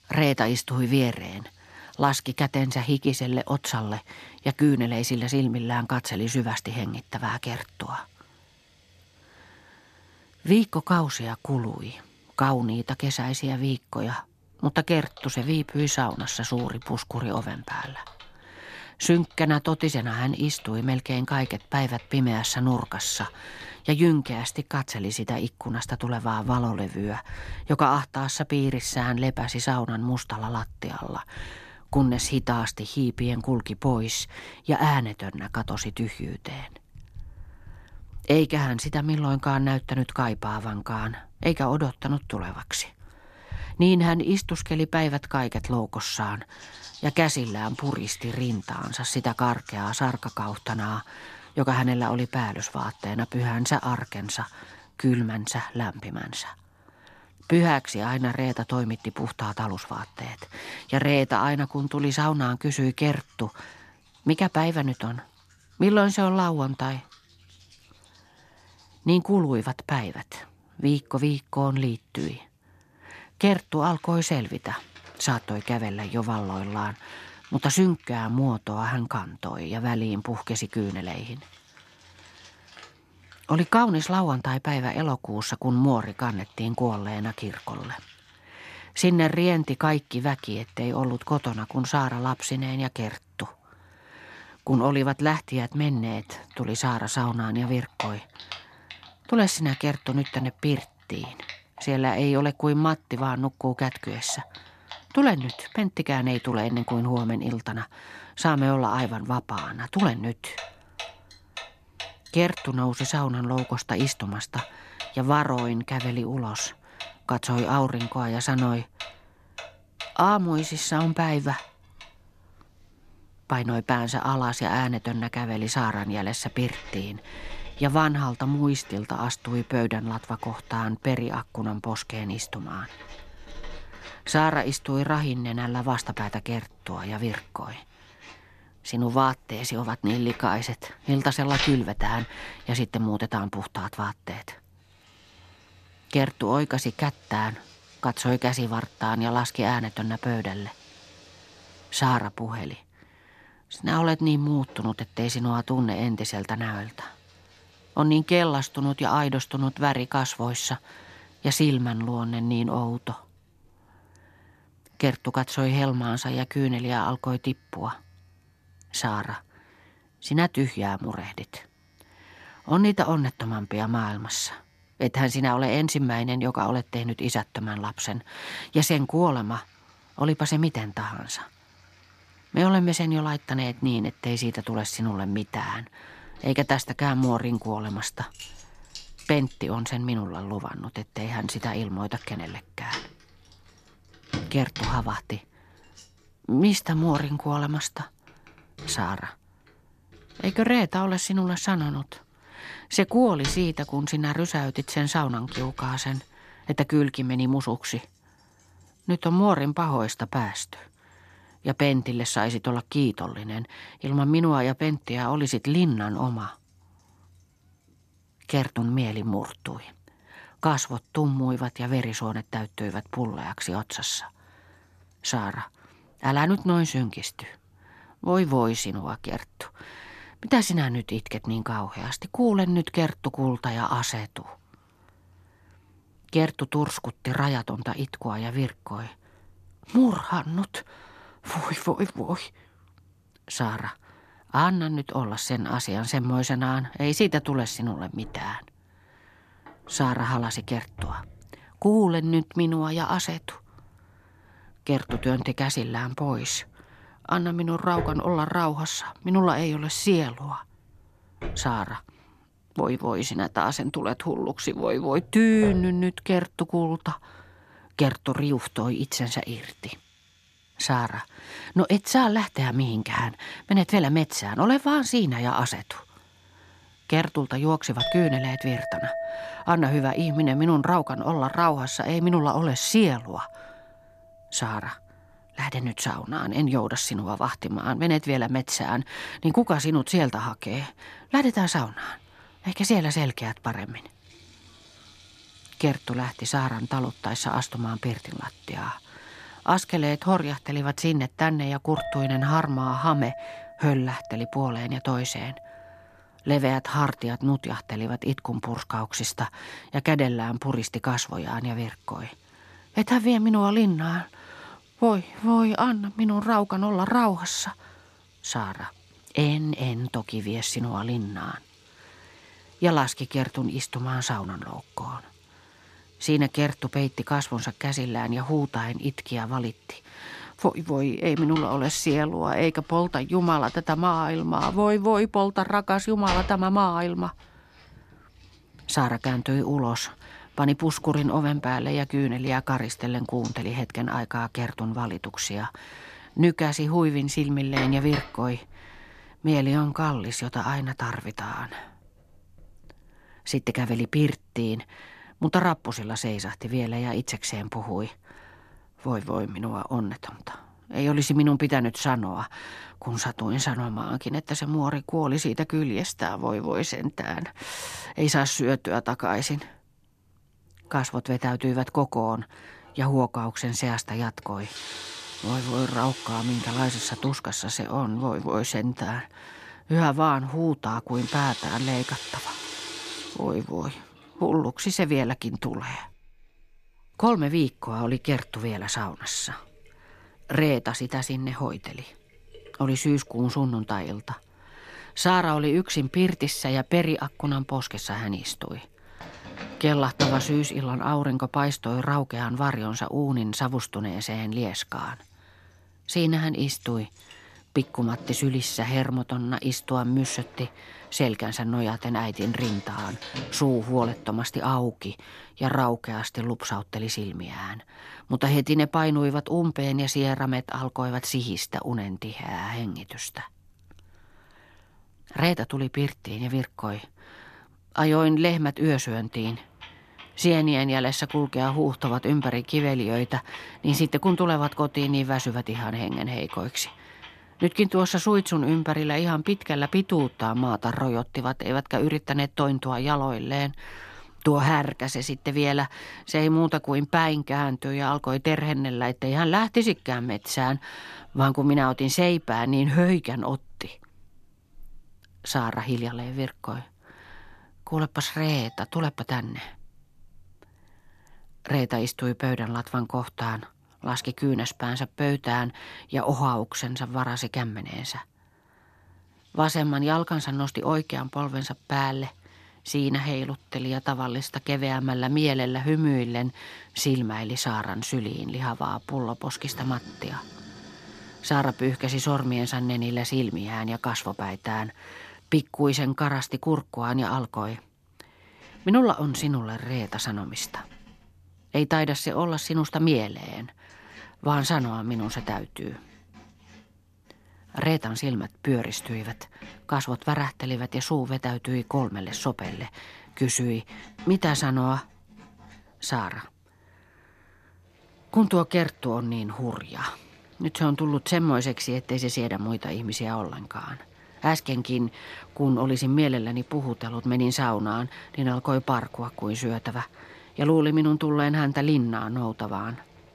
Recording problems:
household noises; noticeable; throughout; 15 dB below the speech

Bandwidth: 14 kHz